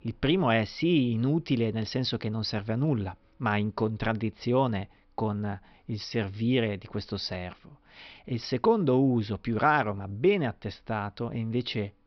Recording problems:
high frequencies cut off; noticeable; nothing above 5.5 kHz

